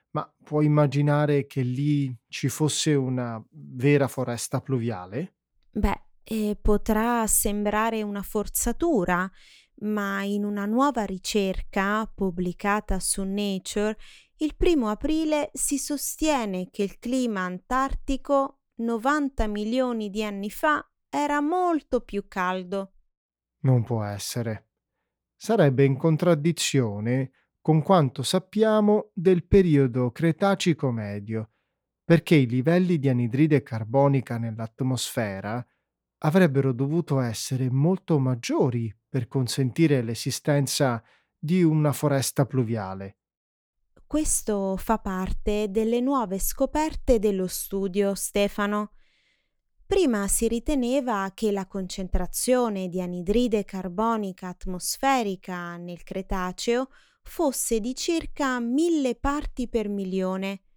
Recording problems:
none

